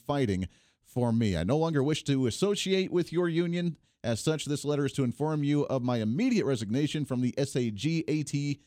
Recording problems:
none

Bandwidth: 17.5 kHz